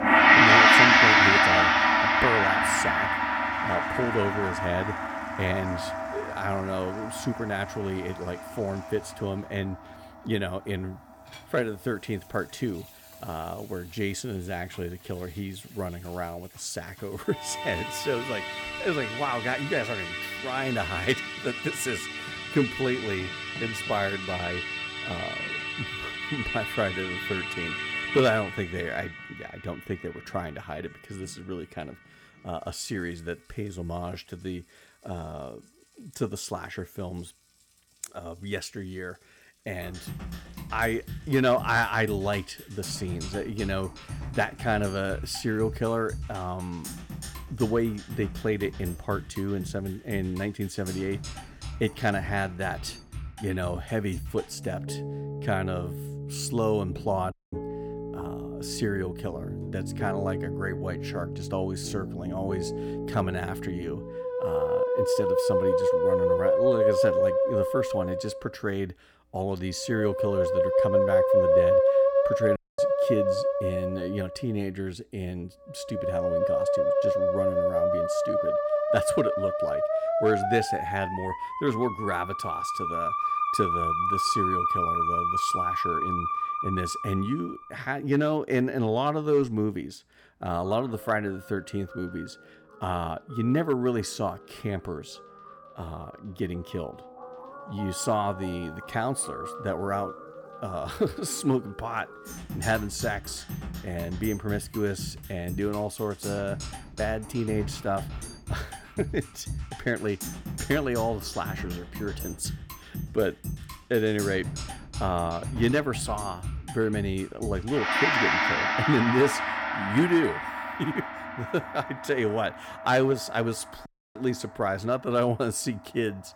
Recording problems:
background music; very loud; throughout; 4 dB above the speech
household noises; faint; throughout; 25 dB below the speech
audio cutting out; at 57 s, at 1:13 and at 2:04

